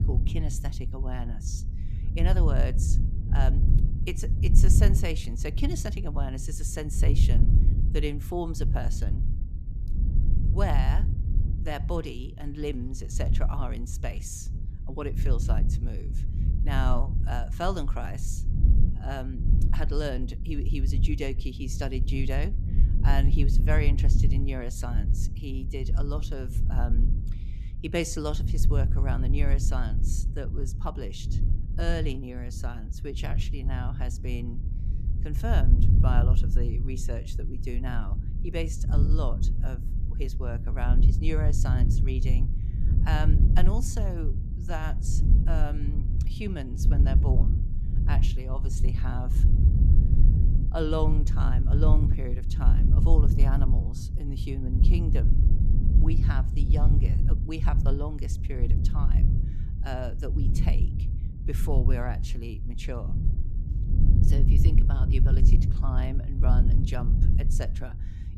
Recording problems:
low rumble; loud; throughout; 5 dB below the speech

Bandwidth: 14.5 kHz